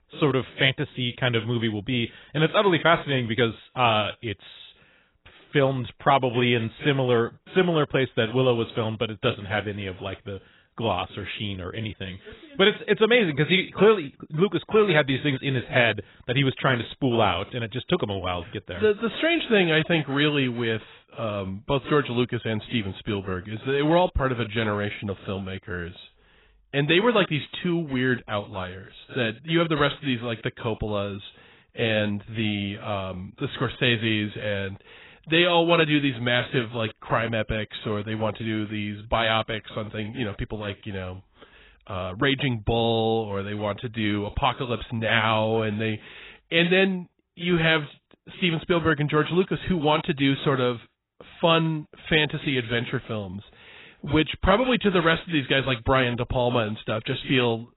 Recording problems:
garbled, watery; badly; nothing above 4 kHz

